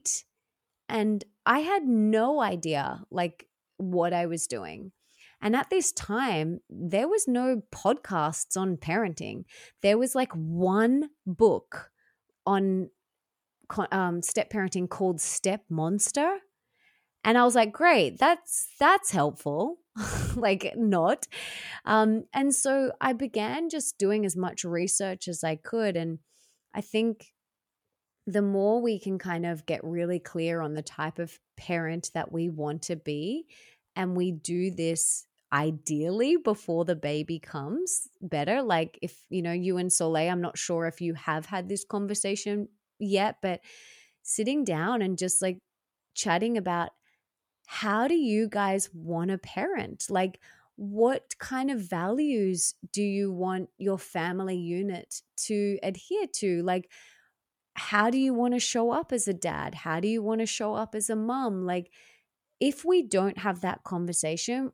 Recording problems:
none

